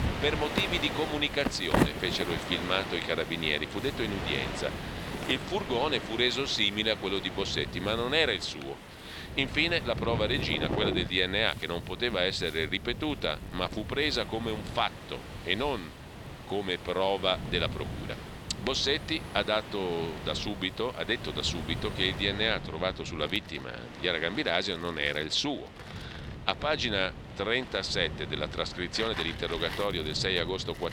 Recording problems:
thin; somewhat; fading below 750 Hz
wind in the background; loud; throughout; 9 dB below the speech
wind noise on the microphone; occasional gusts; 20 dB below the speech

